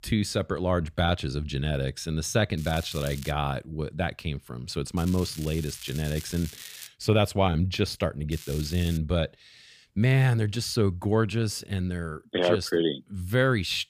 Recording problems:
crackling; noticeable; at 2.5 s, from 5 to 7 s and at 8.5 s; 15 dB below the speech

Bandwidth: 15 kHz